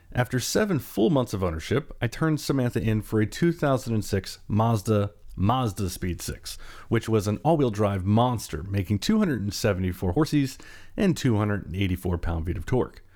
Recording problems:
uneven, jittery; strongly; from 2 to 12 s

